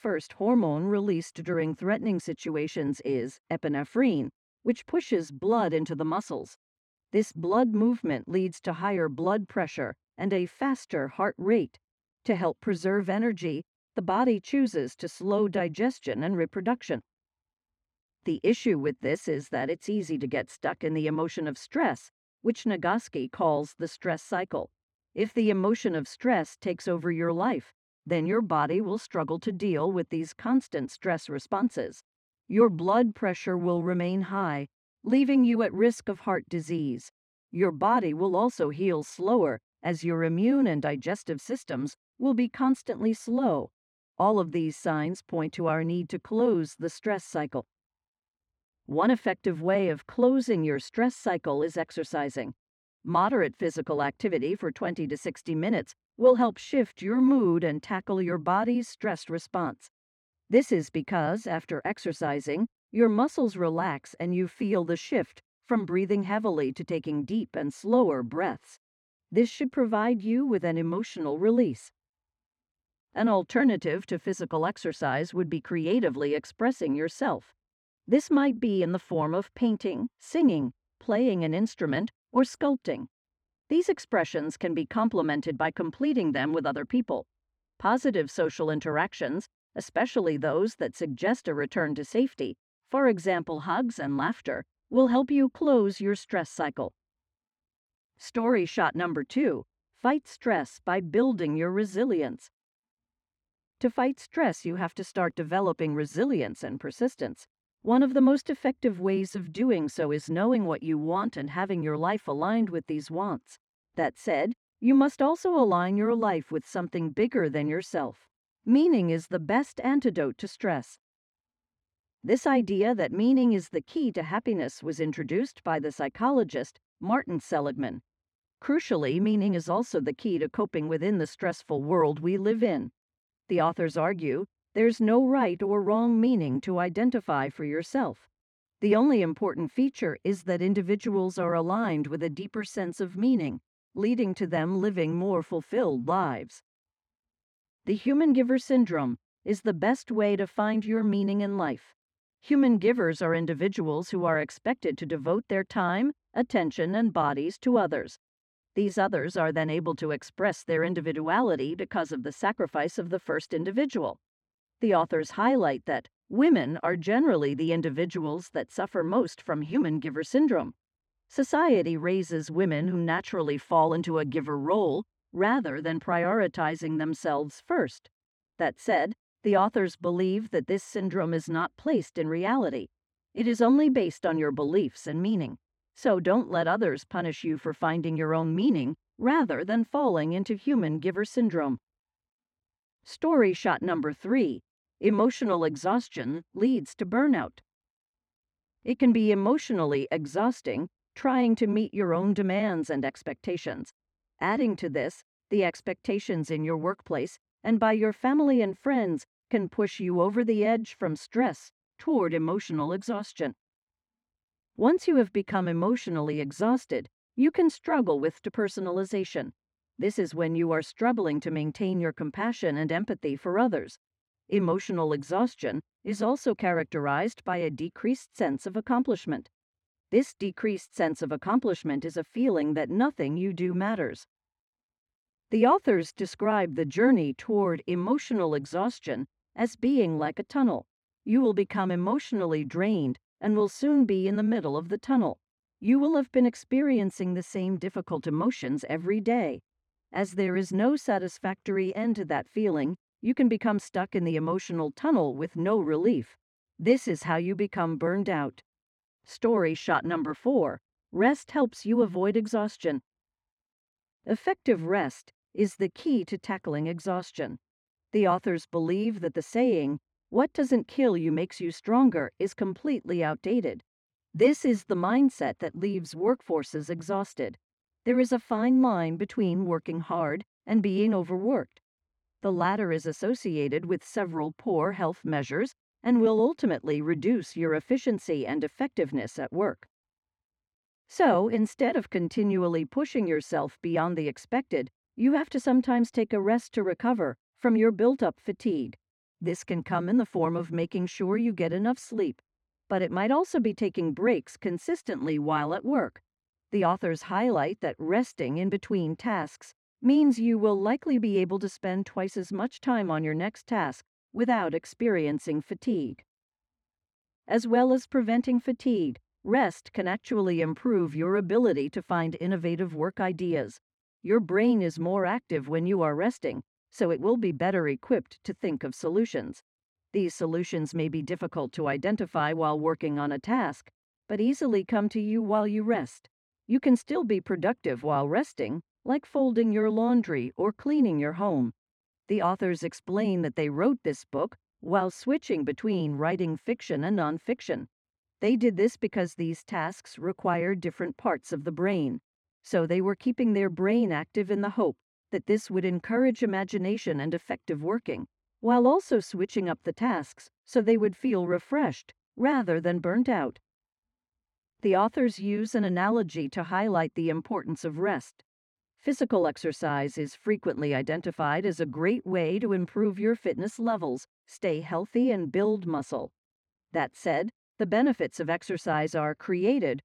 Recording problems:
muffled; slightly; fading above 1.5 kHz

